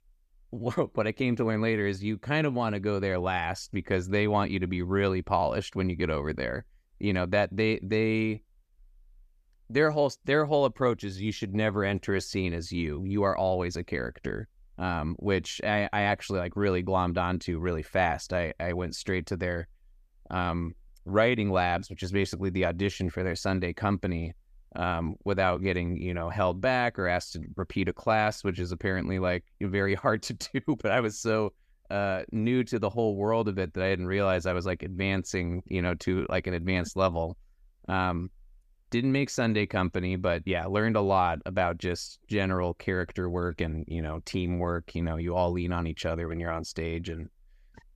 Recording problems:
none

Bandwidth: 14.5 kHz